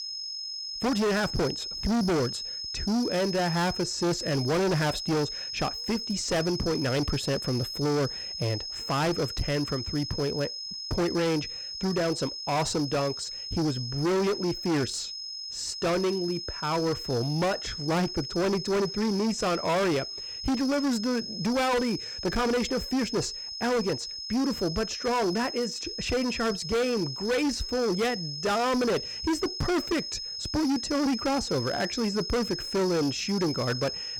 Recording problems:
distortion; heavy; 20% of the sound clipped
high-pitched whine; loud; throughout; 5 kHz, 6 dB below the speech

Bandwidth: 18 kHz